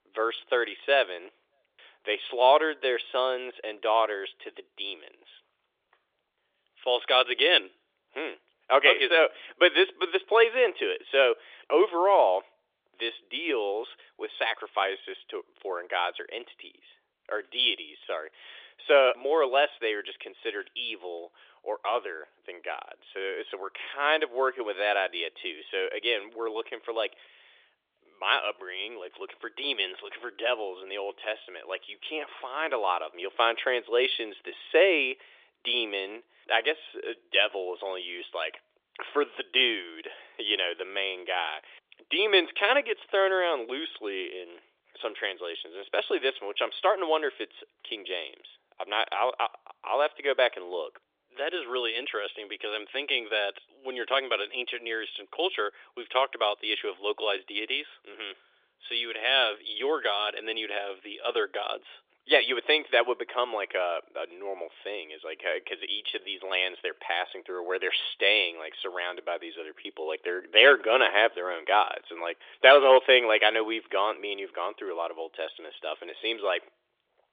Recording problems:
thin; very; fading below 350 Hz
phone-call audio; nothing above 3.5 kHz

